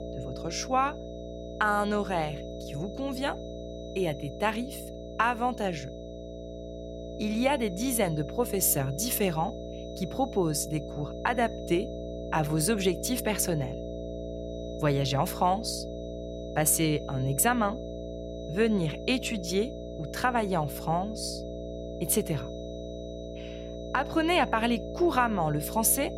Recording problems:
electrical hum; noticeable; throughout; 60 Hz, 10 dB below the speech
high-pitched whine; faint; throughout; 4 kHz, 25 dB below the speech

